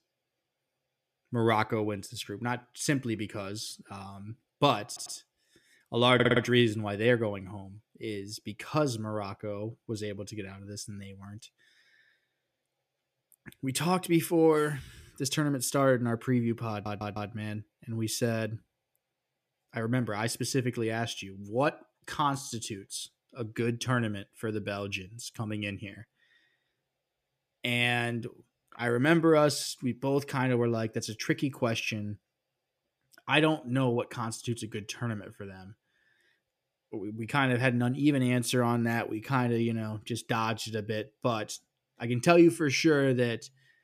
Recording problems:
audio stuttering; at 5 s, at 6 s and at 17 s

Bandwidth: 14.5 kHz